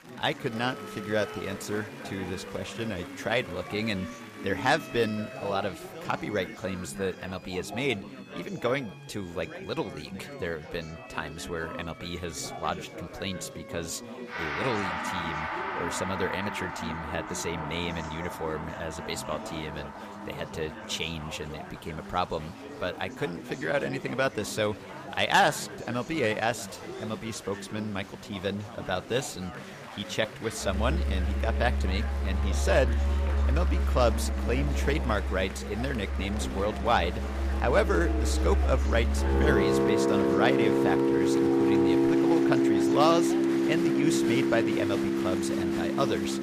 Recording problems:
background music; very loud; throughout; 3 dB above the speech
chatter from many people; loud; throughout; 10 dB below the speech

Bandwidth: 15 kHz